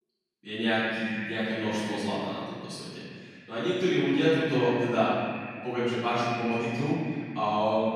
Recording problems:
echo of what is said; strong; throughout; 100 ms later, 10 dB below the speech
room echo; strong; dies away in 1.7 s
off-mic speech; far

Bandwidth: 14.5 kHz